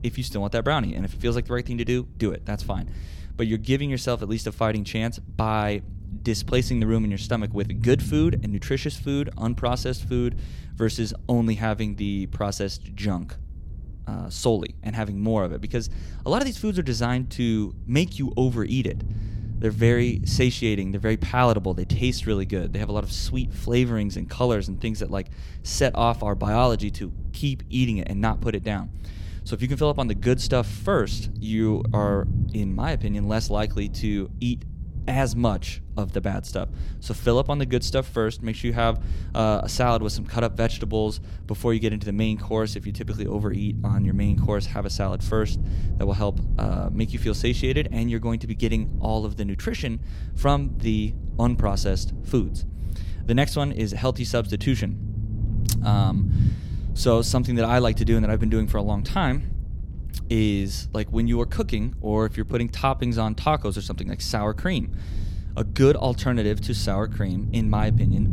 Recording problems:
low rumble; noticeable; throughout; 15 dB below the speech

